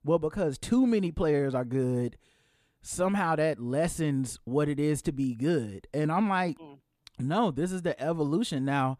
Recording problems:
none

